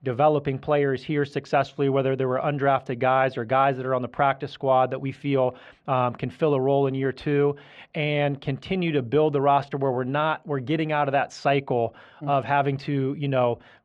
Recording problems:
muffled; slightly; fading above 2.5 kHz

